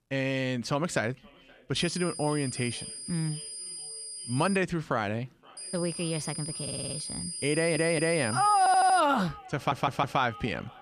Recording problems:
echo of what is said; faint; throughout; 520 ms later, 25 dB below the speech
high-pitched whine; loud; from 2 to 4.5 s and from 5.5 to 9 s; 9 kHz, 7 dB below the speech
audio stuttering; 4 times, first at 6.5 s

